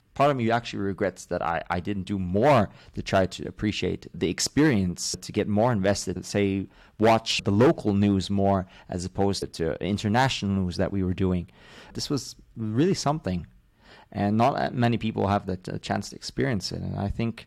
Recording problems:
distortion; slight; 2% of the sound clipped

